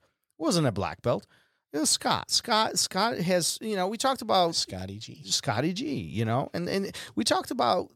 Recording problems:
none

